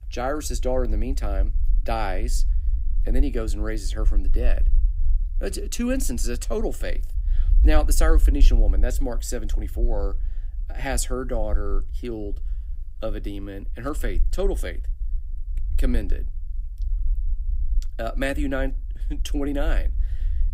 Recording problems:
low rumble; faint; throughout; 20 dB below the speech

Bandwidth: 15.5 kHz